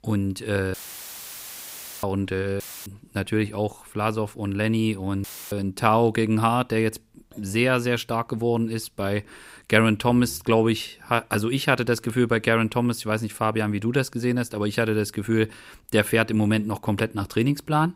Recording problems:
audio cutting out; filled with static; at 0.5 s for 1.5 s, at 2.5 s and at 5 s

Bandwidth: 15.5 kHz